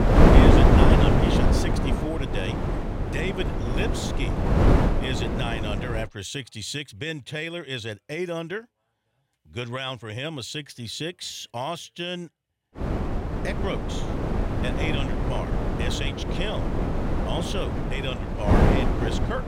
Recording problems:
wind noise on the microphone; heavy; until 6 s and from 13 s on; 4 dB above the speech

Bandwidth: 16 kHz